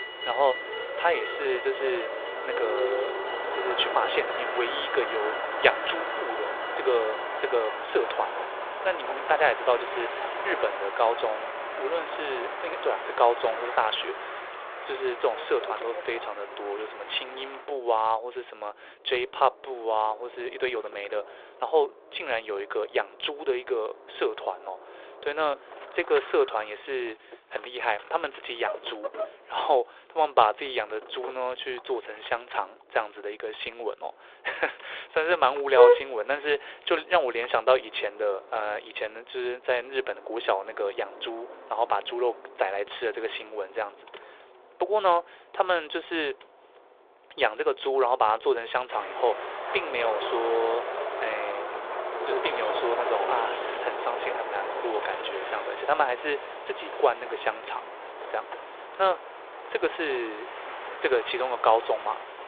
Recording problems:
phone-call audio
traffic noise; loud; throughout; 3 dB below the speech

